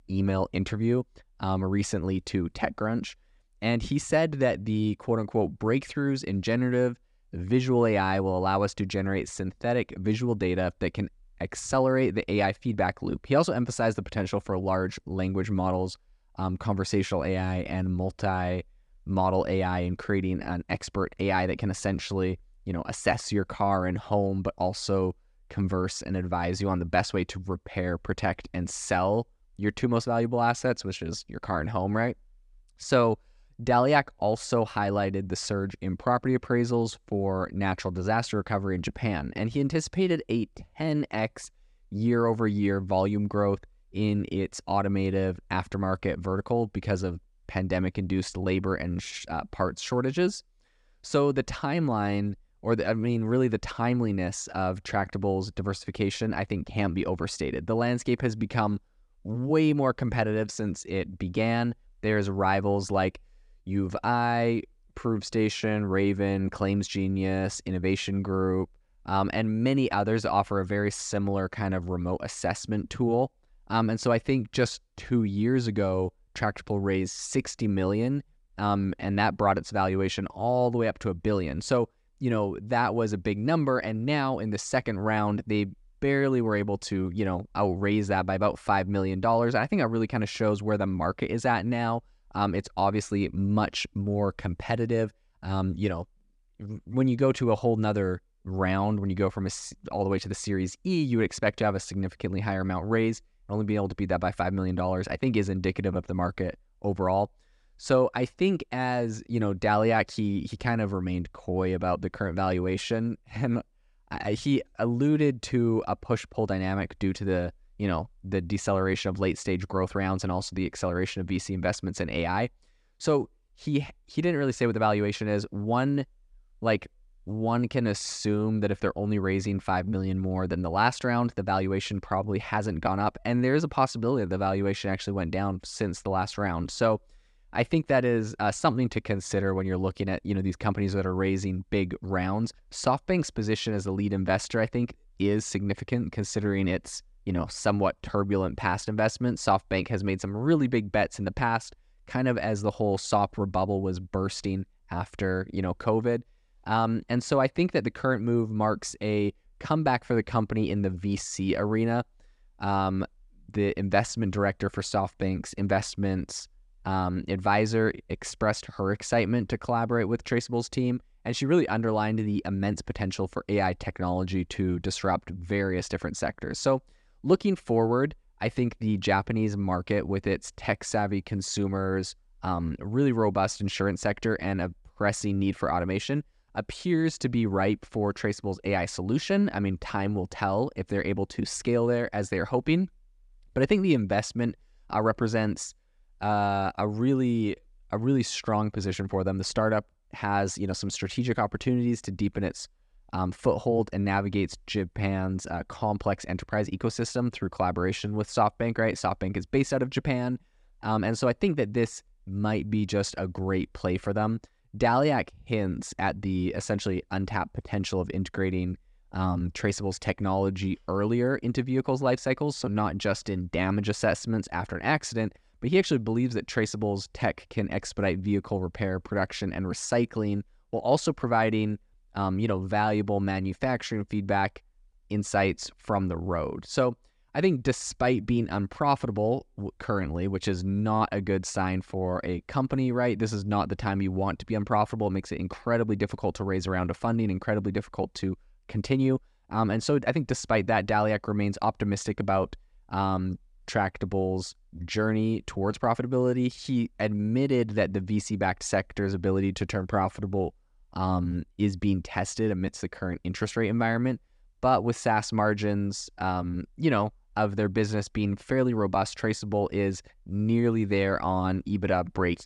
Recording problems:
none

